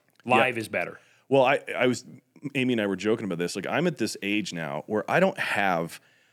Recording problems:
none

